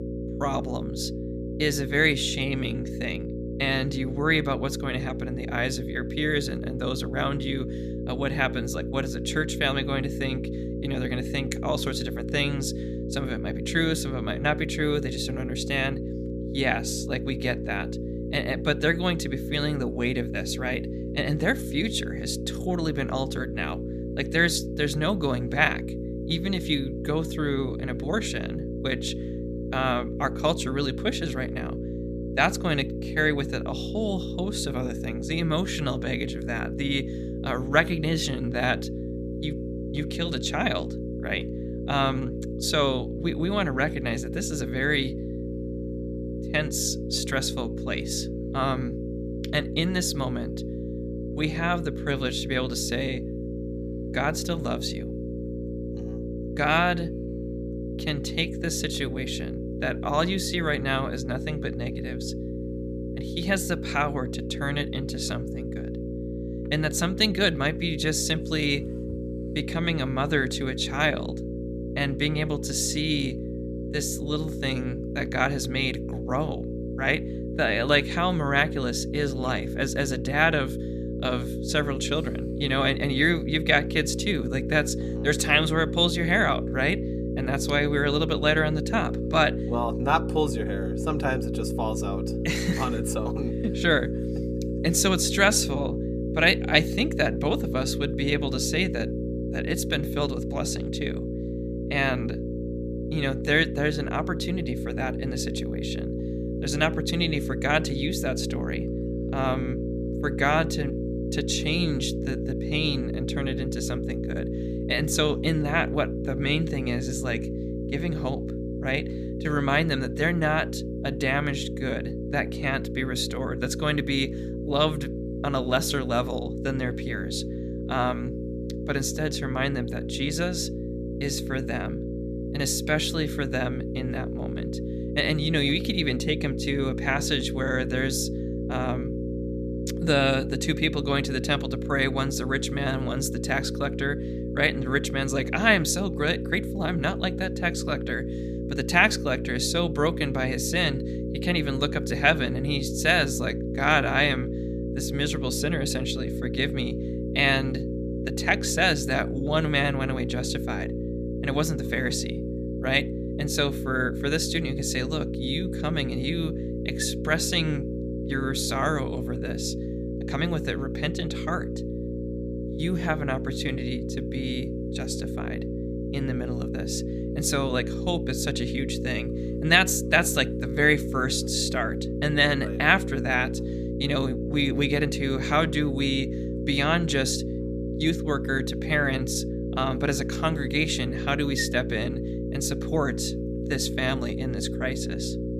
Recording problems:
electrical hum; loud; throughout; 60 Hz, 9 dB below the speech

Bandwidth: 14.5 kHz